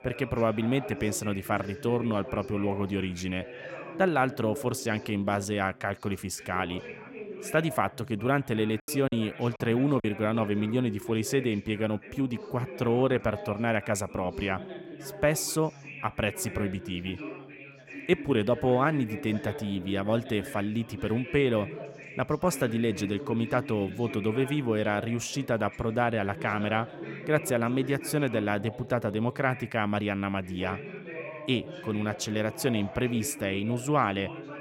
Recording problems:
background chatter; noticeable; throughout; 4 voices, 10 dB below the speech
choppy; very; from 9 to 10 s; 5% of the speech affected

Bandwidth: 16.5 kHz